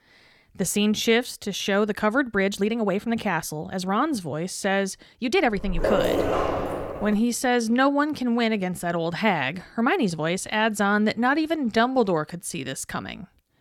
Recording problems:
uneven, jittery; strongly; from 1 to 13 s
dog barking; loud; from 5.5 to 7 s; peak 1 dB above the speech

